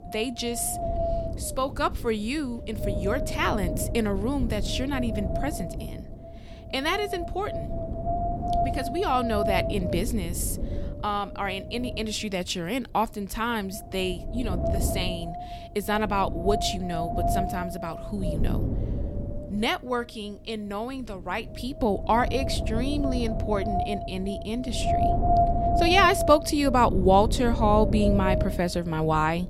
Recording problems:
wind noise on the microphone; heavy; 4 dB below the speech

